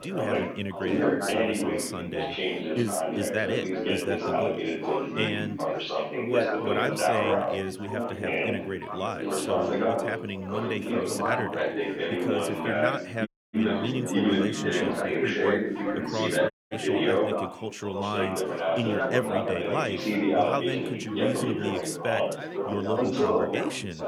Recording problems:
chatter from many people; very loud; throughout; 5 dB above the speech
audio cutting out; at 13 s and at 17 s

